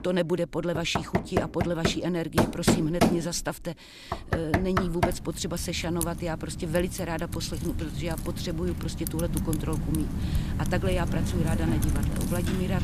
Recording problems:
household noises; very loud; throughout; 1 dB above the speech

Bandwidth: 14.5 kHz